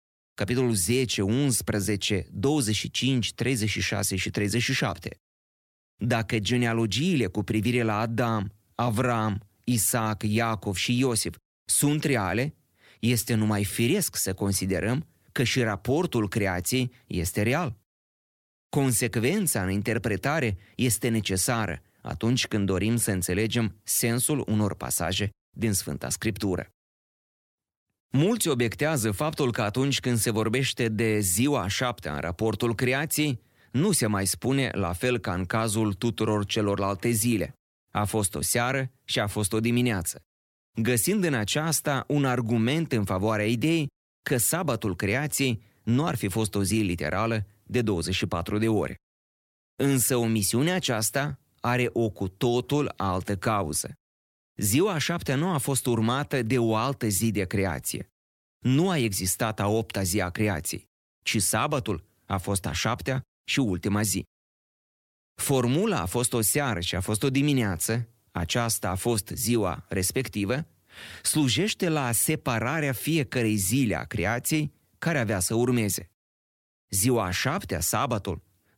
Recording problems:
none

